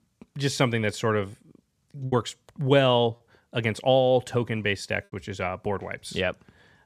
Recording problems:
choppy; occasionally; at 2 s and at 5 s; 3% of the speech affected

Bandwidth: 14.5 kHz